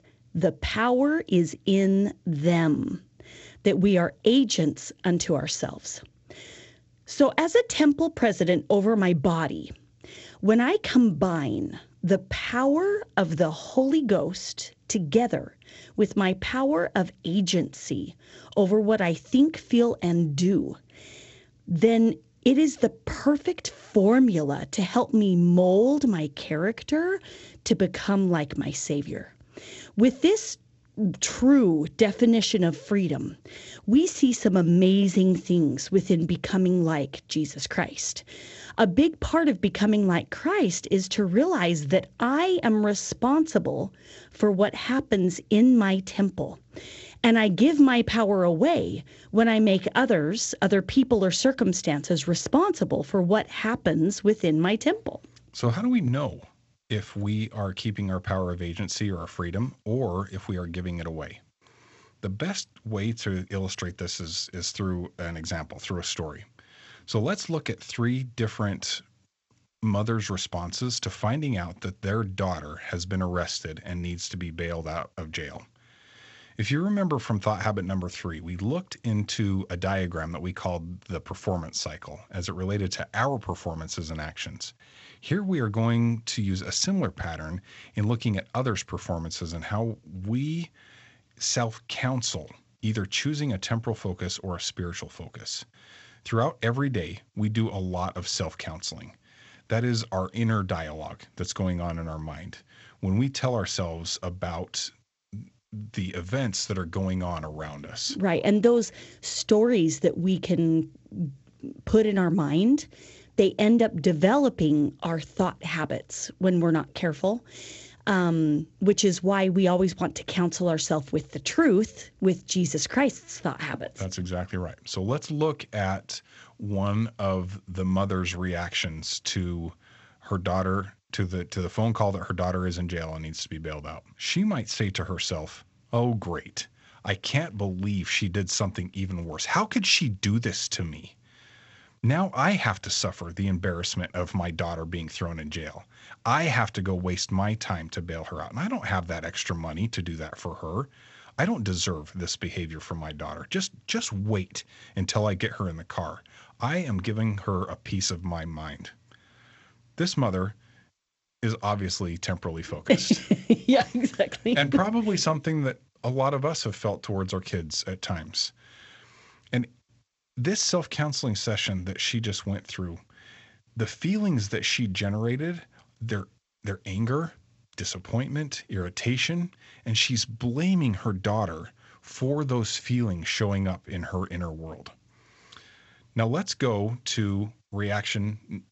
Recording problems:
garbled, watery; slightly; nothing above 7.5 kHz
high frequencies cut off; slight

